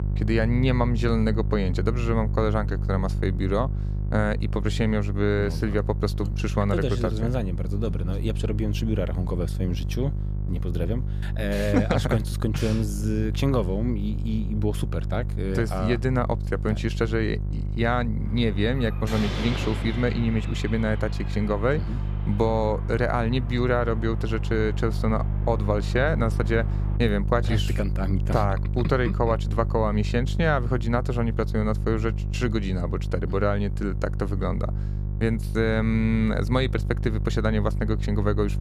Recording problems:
electrical hum; noticeable; throughout; 50 Hz, 15 dB below the speech
door banging; noticeable; from 18 to 27 s; peak 4 dB below the speech

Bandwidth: 15 kHz